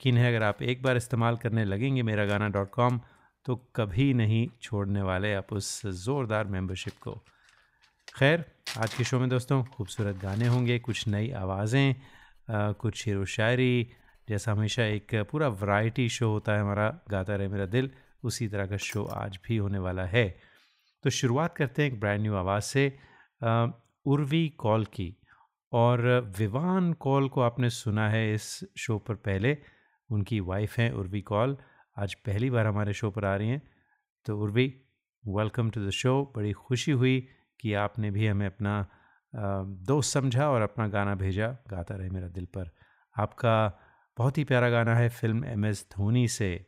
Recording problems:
household noises; noticeable; until 19 s; 20 dB below the speech

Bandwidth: 15.5 kHz